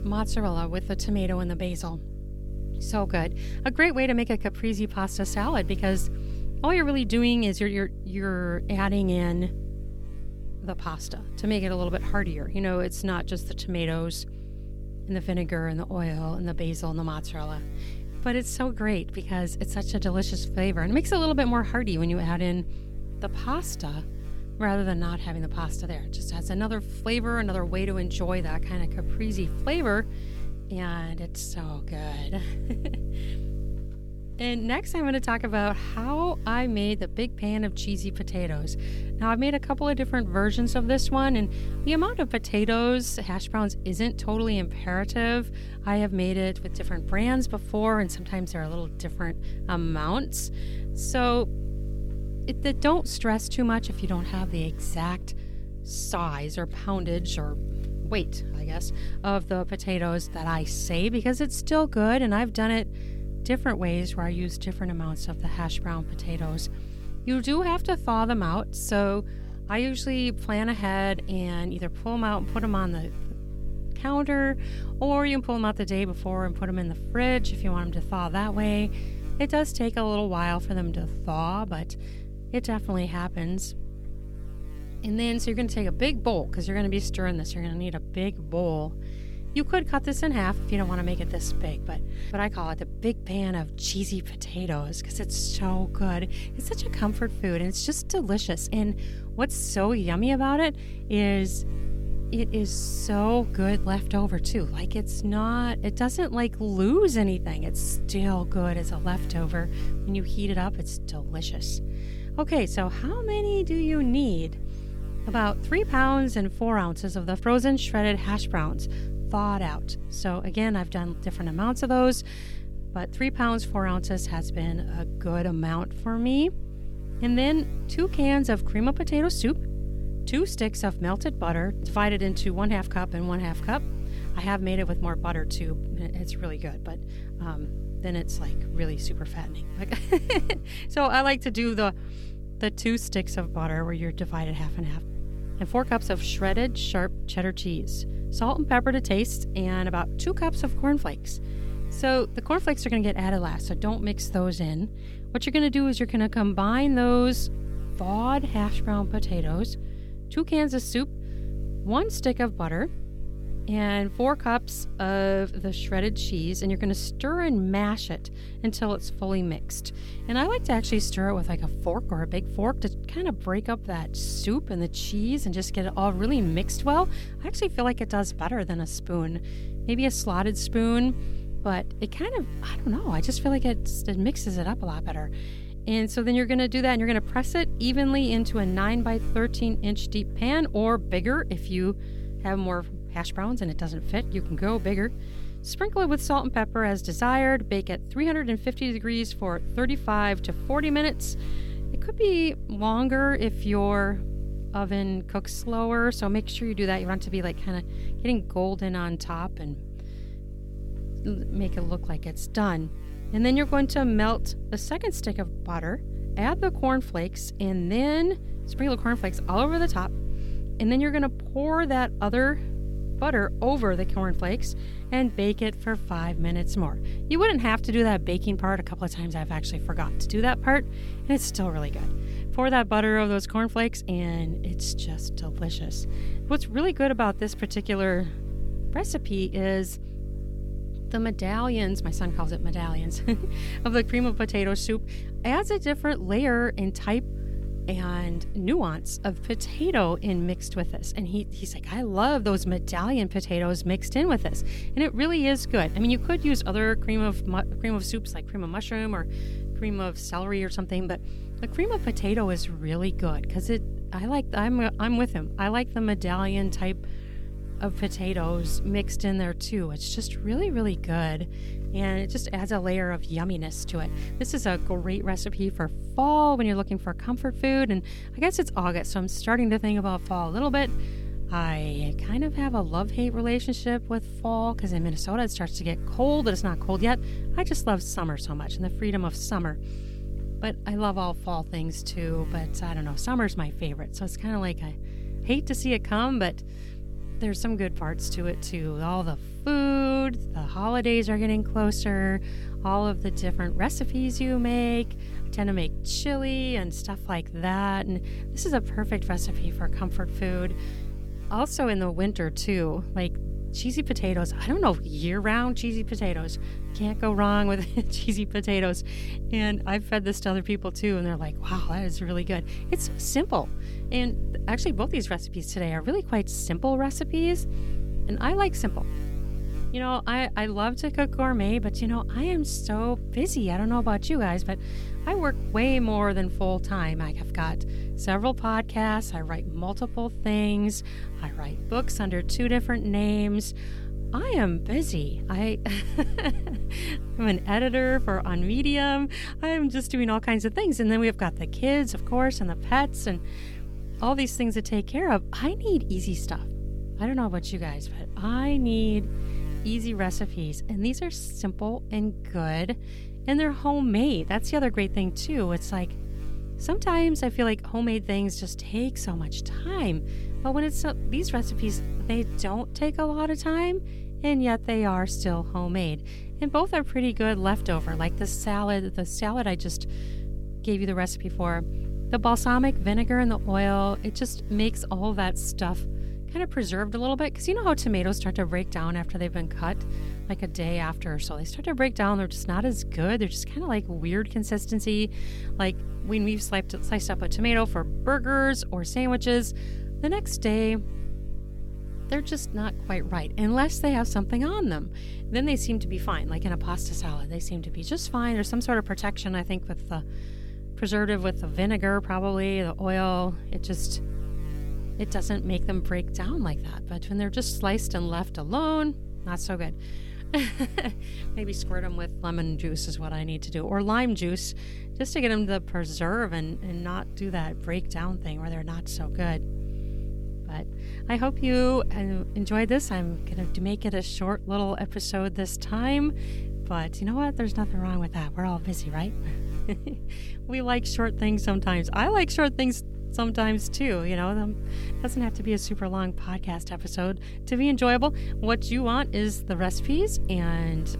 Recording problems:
electrical hum; noticeable; throughout; 50 Hz, 20 dB below the speech

